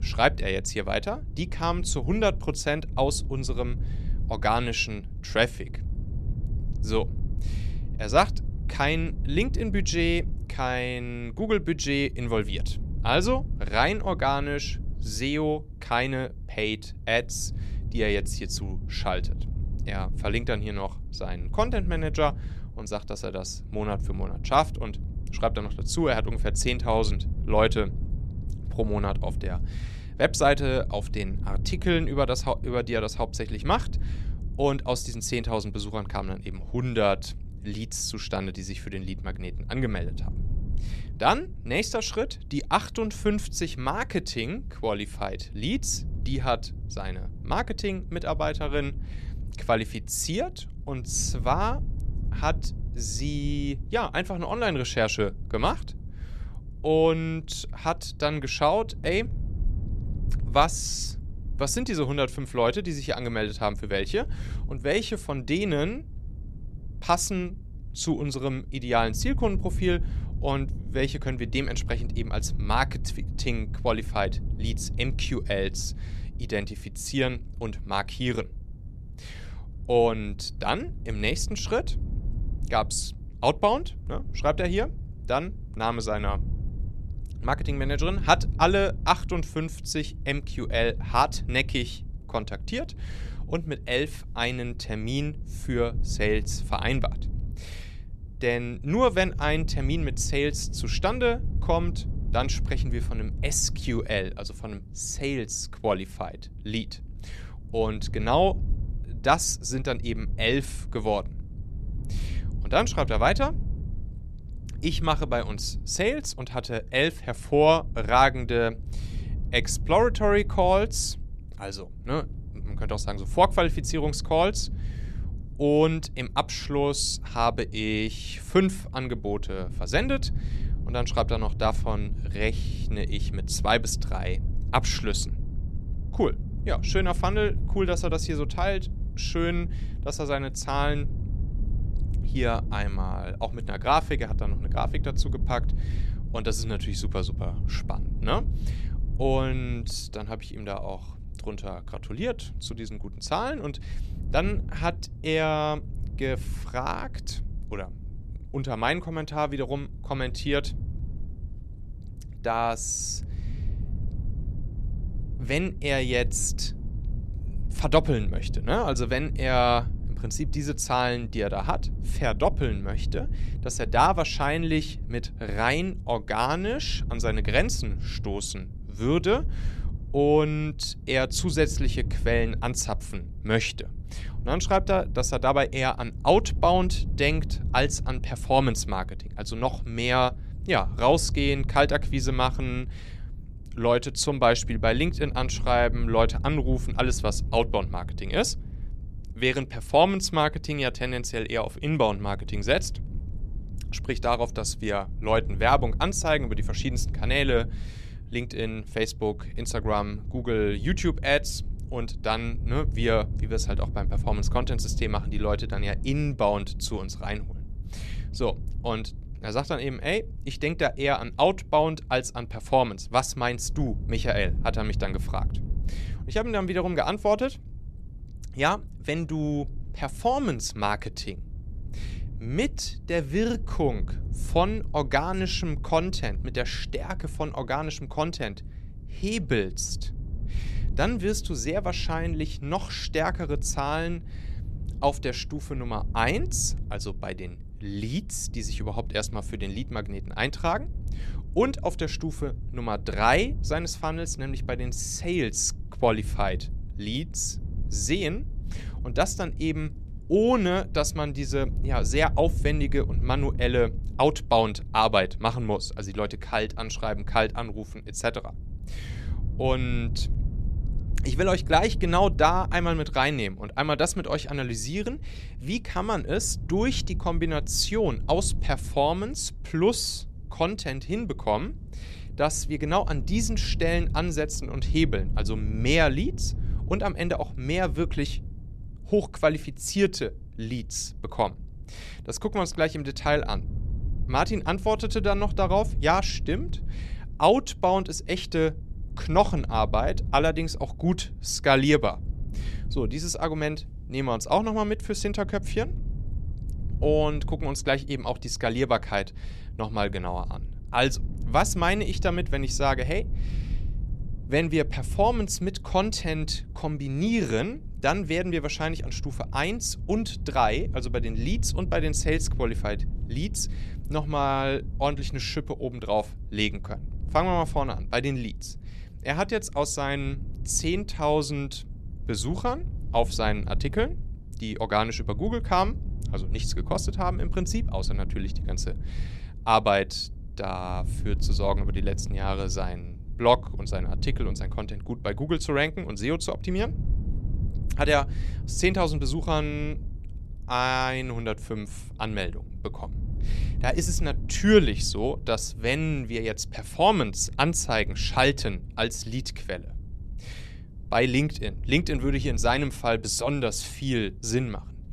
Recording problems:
wind noise on the microphone; occasional gusts; 25 dB below the speech

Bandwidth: 13.5 kHz